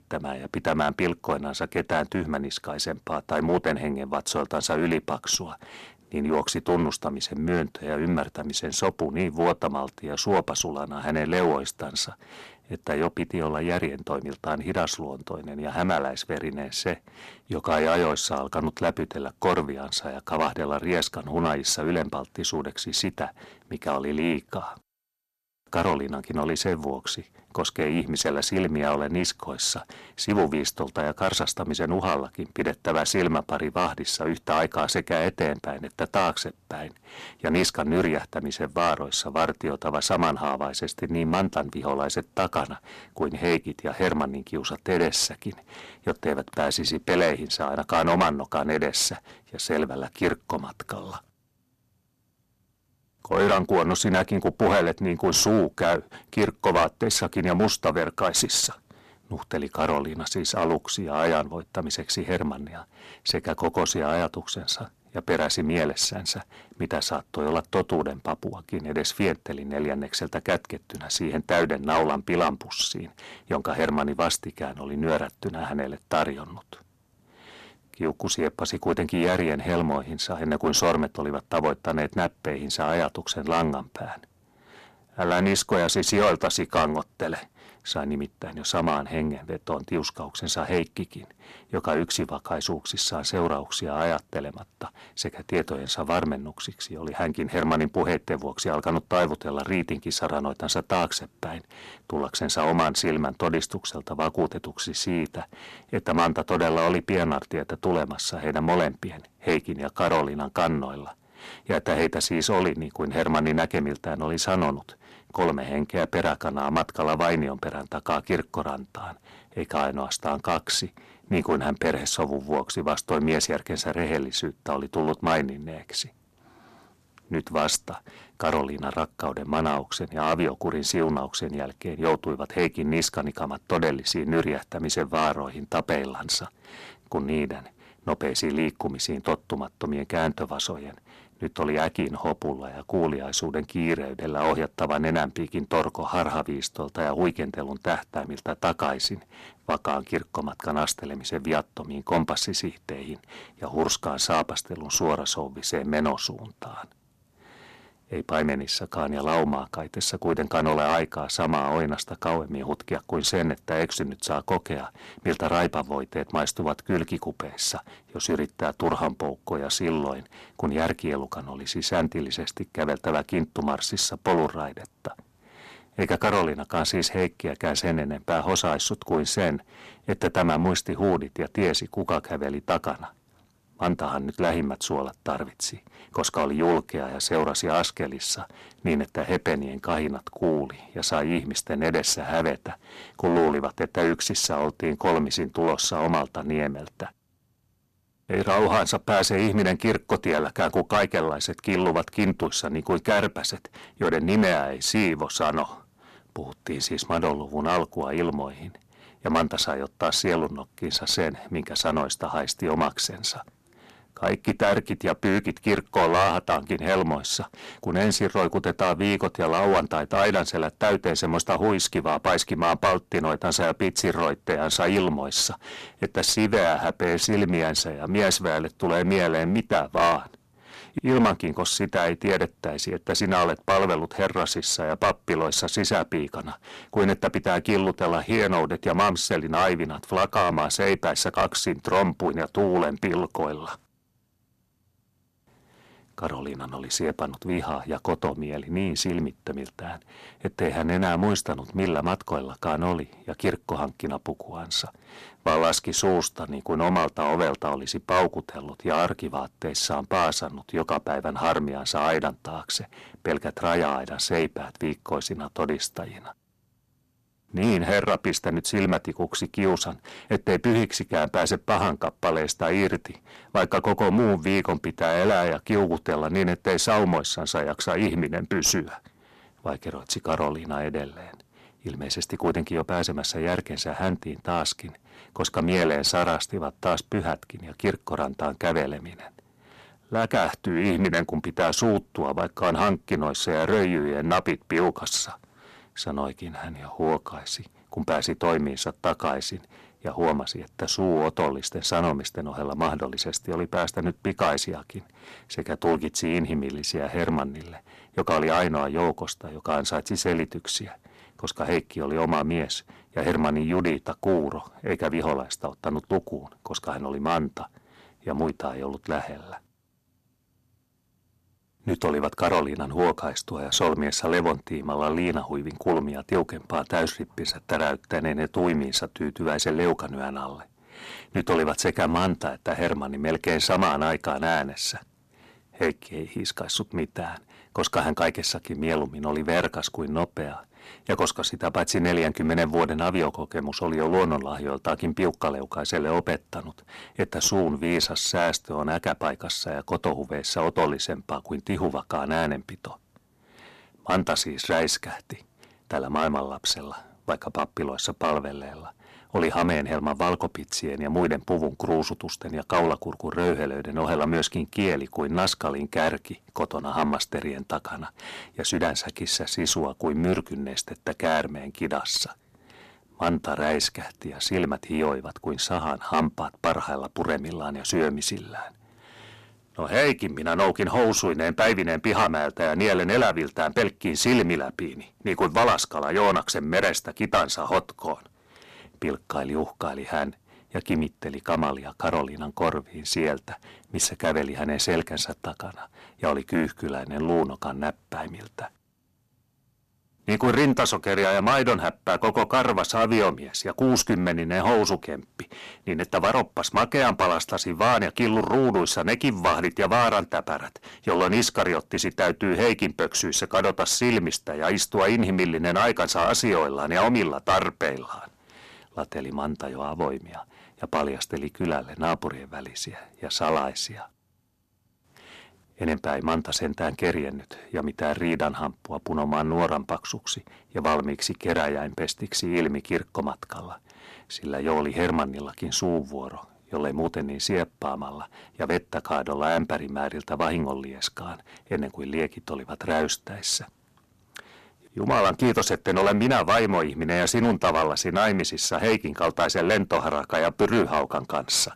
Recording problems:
distortion; heavy; 5% of the sound clipped

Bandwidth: 13.5 kHz